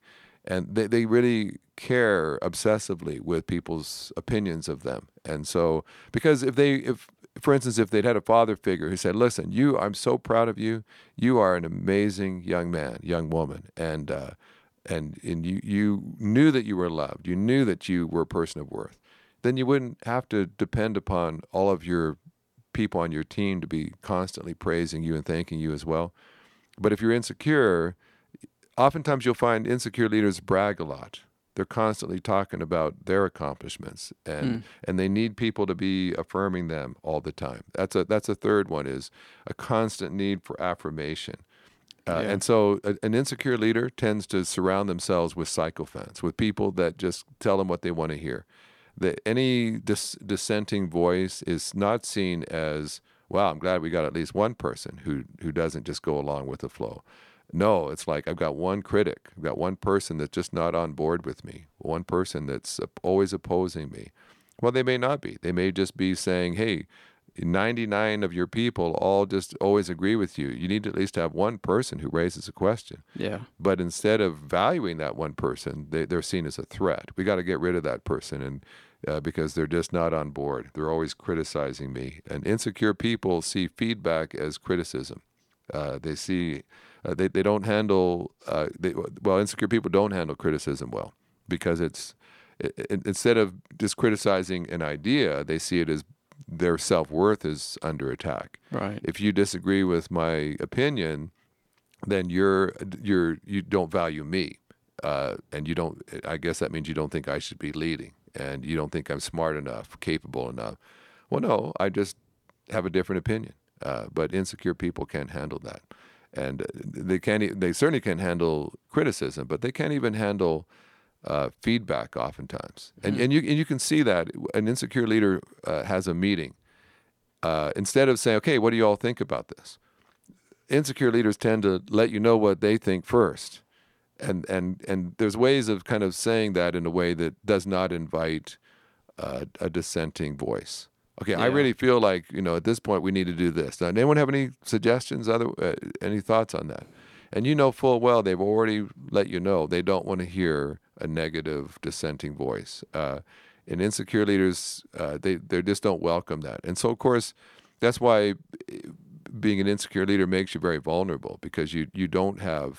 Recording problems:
none

